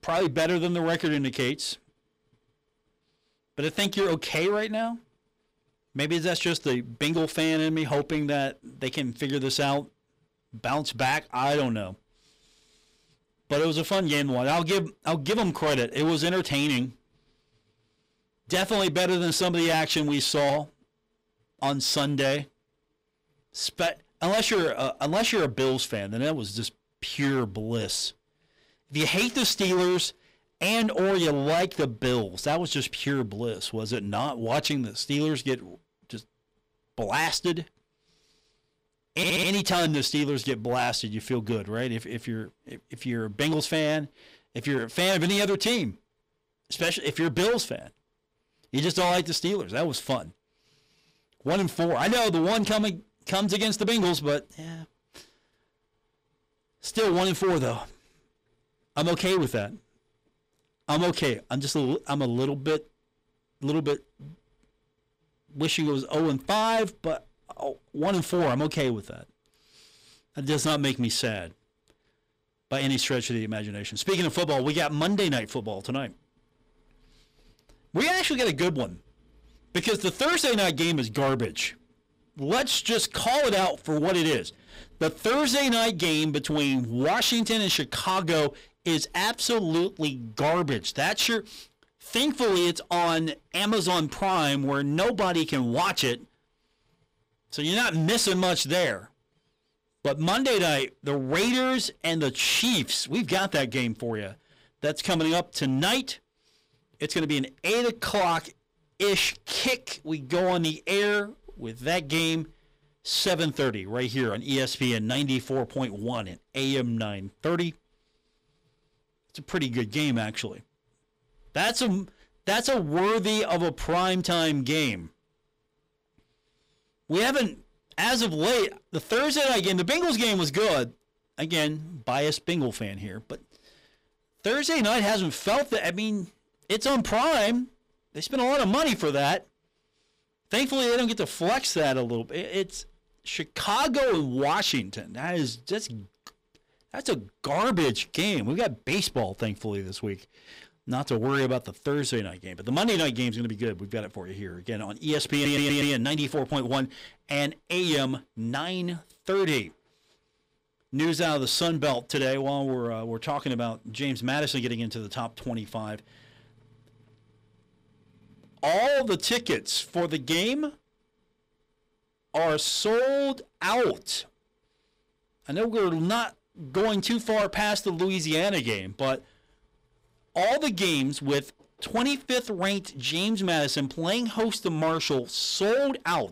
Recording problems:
distortion; heavy; 12% of the sound clipped
audio stuttering; at 39 s and at 2:35

